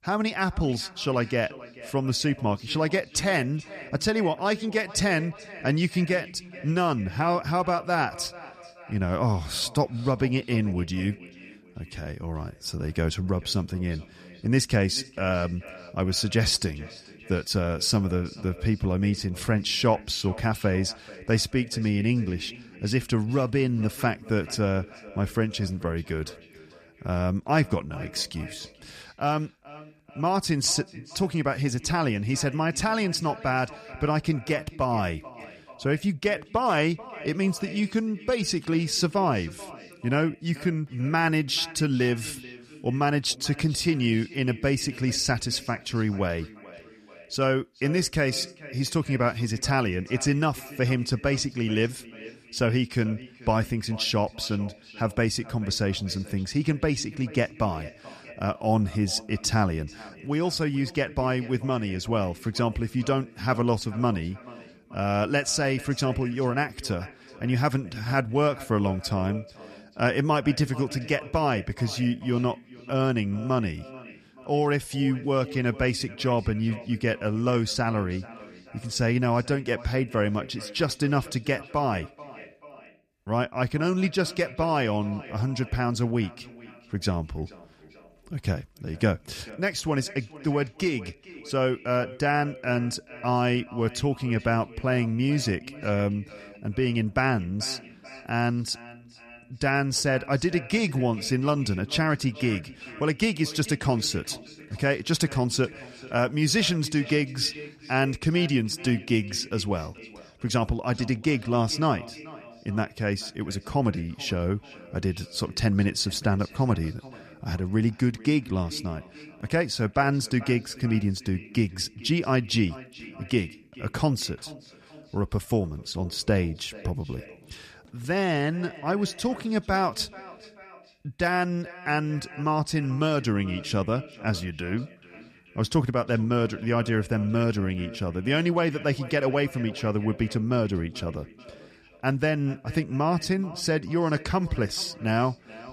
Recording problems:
echo of what is said; faint; throughout; 430 ms later, 20 dB below the speech

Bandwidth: 14.5 kHz